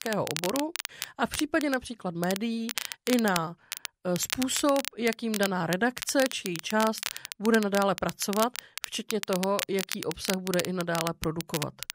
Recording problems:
crackle, like an old record; loud; 6 dB below the speech

